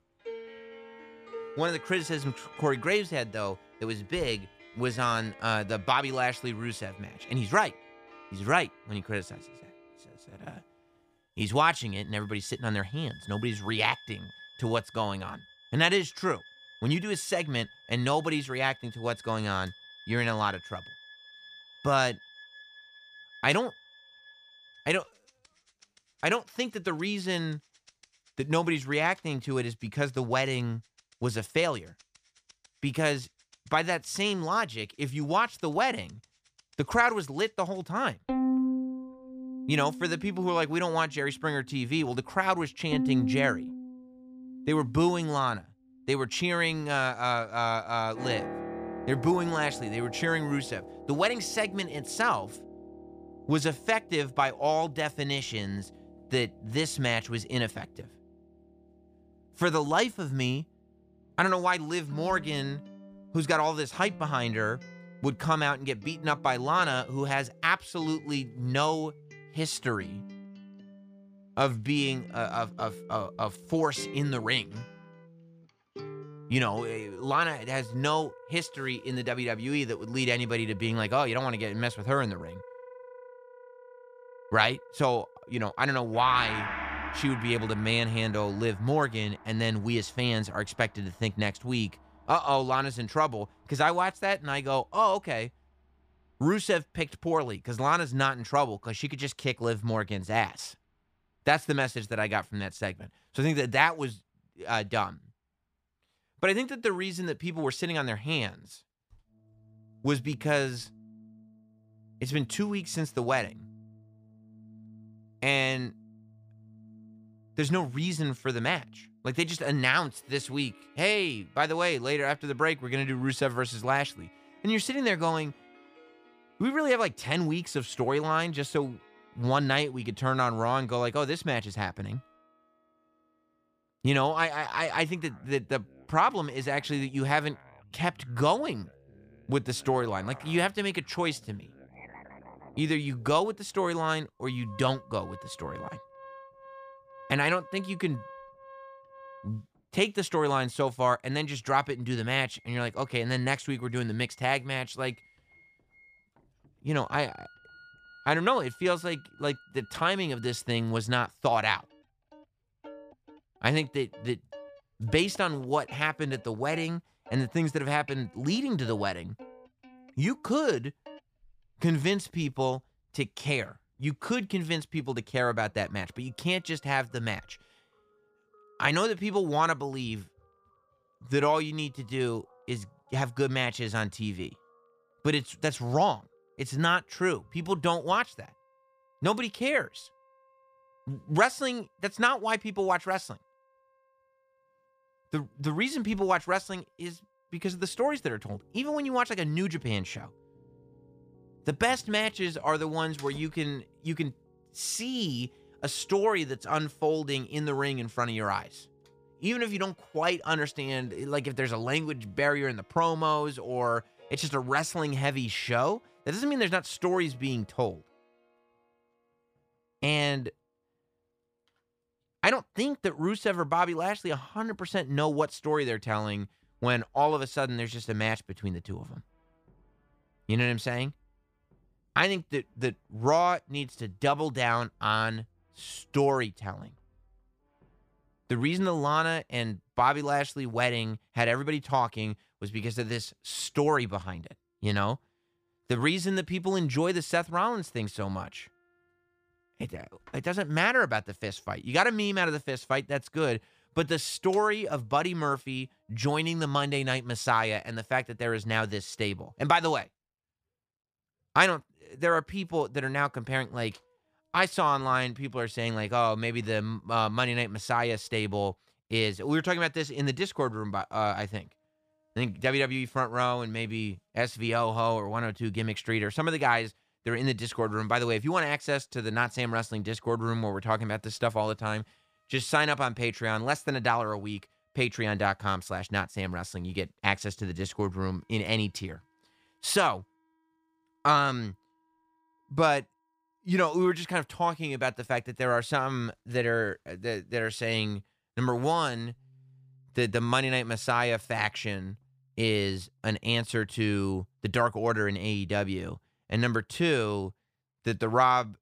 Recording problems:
background music; noticeable; throughout; 15 dB below the speech

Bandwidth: 15 kHz